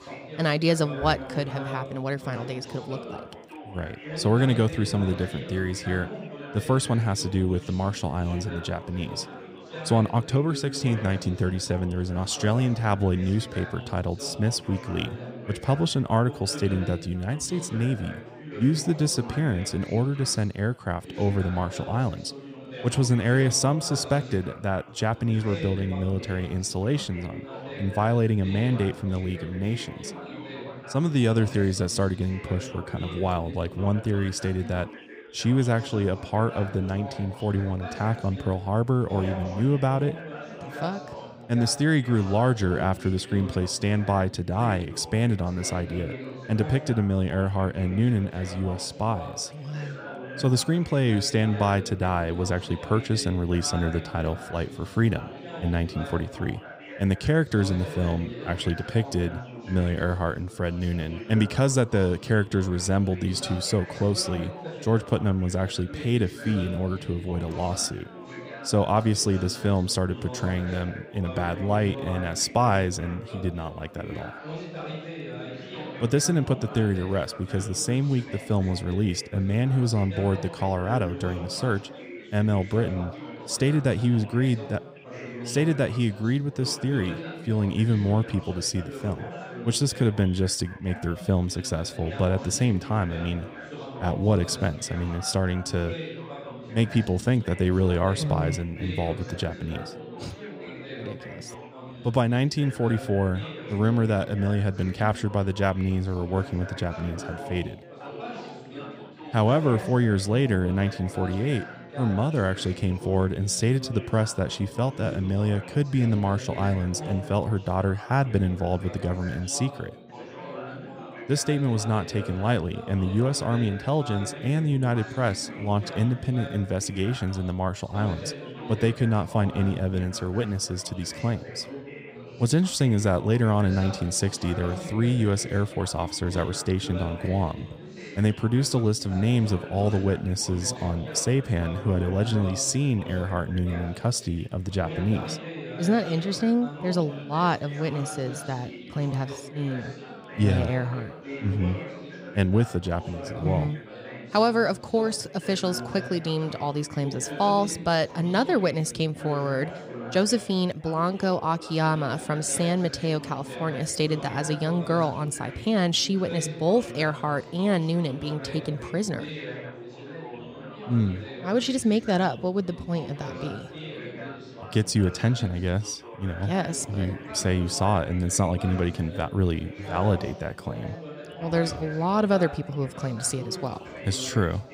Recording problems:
background chatter; noticeable; throughout; 4 voices, 15 dB below the speech

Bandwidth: 15.5 kHz